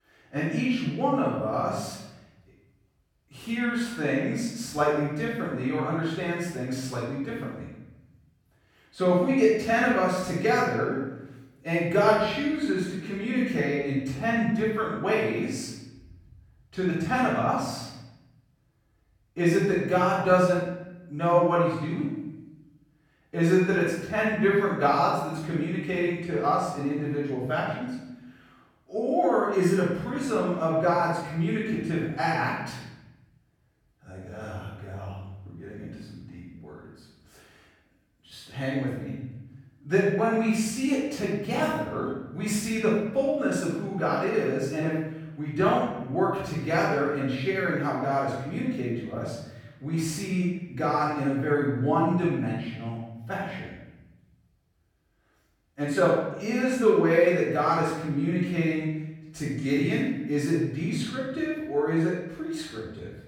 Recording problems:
room echo; strong; dies away in 1 s
off-mic speech; far

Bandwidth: 17.5 kHz